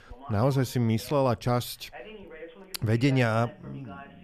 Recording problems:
voice in the background; faint; throughout; 20 dB below the speech

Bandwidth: 14.5 kHz